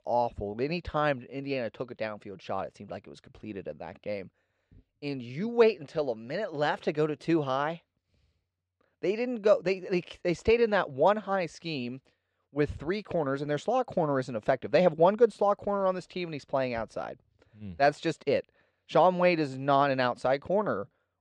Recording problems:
muffled; slightly; fading above 3 kHz

